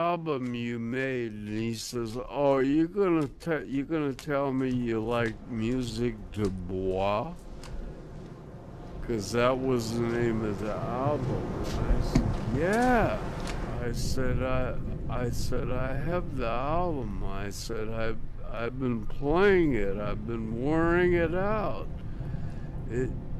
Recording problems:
wrong speed, natural pitch; too slow; 0.5 times normal speed
rain or running water; loud; throughout; 7 dB below the speech
abrupt cut into speech; at the start
uneven, jittery; strongly; from 3.5 to 20 s

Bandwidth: 14 kHz